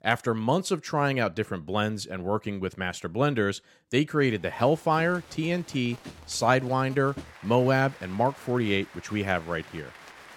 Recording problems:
crowd noise; faint; from 4.5 s on; 20 dB below the speech

